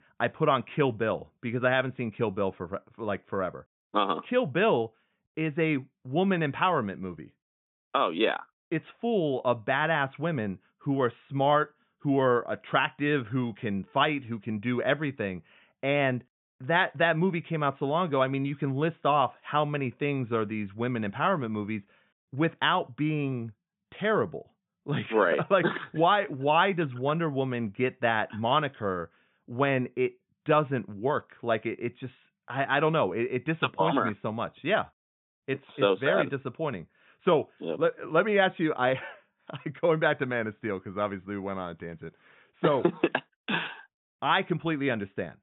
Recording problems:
high frequencies cut off; severe; nothing above 3.5 kHz

